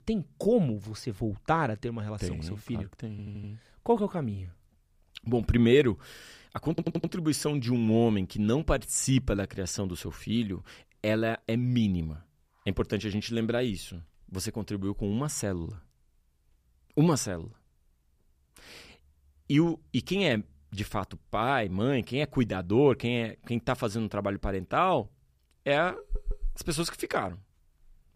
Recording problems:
audio stuttering; at 3 s, at 6.5 s and at 26 s

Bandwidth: 15 kHz